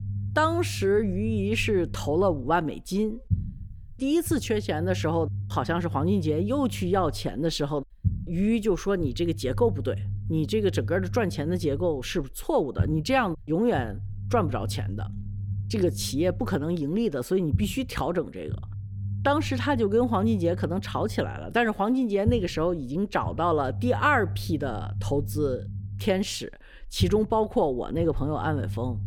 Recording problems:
low rumble; noticeable; throughout; 20 dB below the speech

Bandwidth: 18.5 kHz